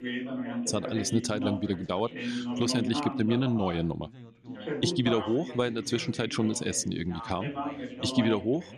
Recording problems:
background chatter; loud; throughout; 3 voices, 6 dB below the speech

